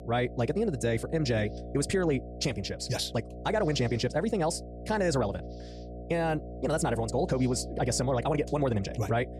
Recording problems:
wrong speed, natural pitch; too fast; 1.7 times normal speed
electrical hum; noticeable; throughout; 60 Hz, 15 dB below the speech

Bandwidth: 14.5 kHz